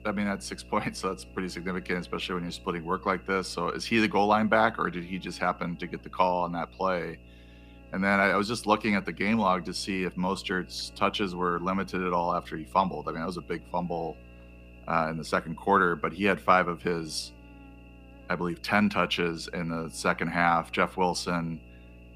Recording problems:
electrical hum; faint; throughout; 60 Hz, 25 dB below the speech

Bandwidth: 15 kHz